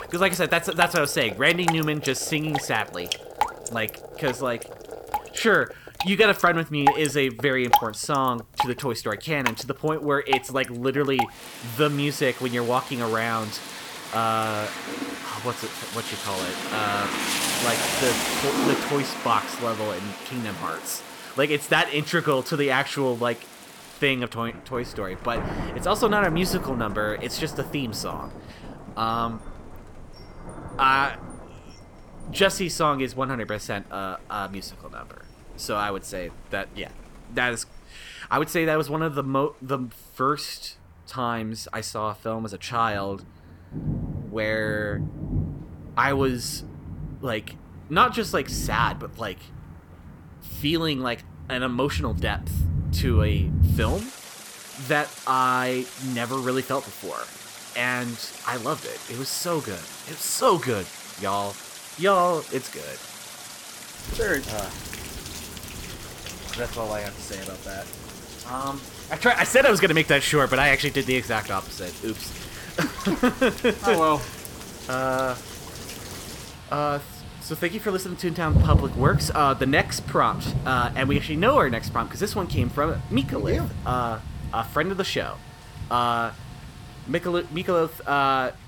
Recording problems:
rain or running water; loud; throughout; 7 dB below the speech

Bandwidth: 18.5 kHz